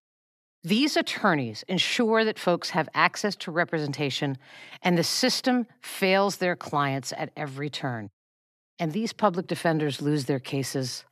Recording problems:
none

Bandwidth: 14 kHz